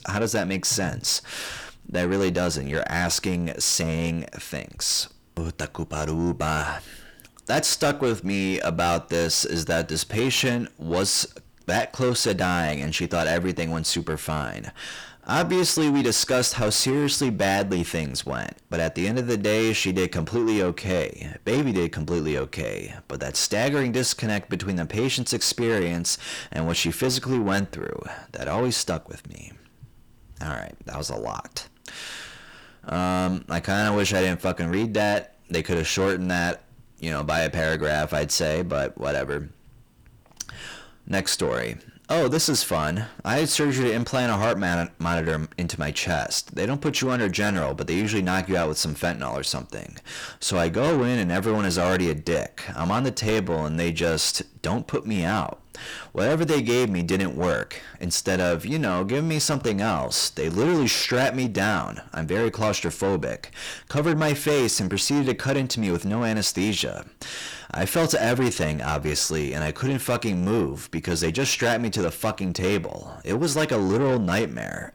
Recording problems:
distortion; heavy; 8 dB below the speech

